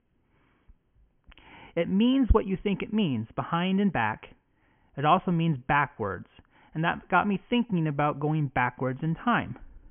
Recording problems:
high frequencies cut off; severe; nothing above 3 kHz

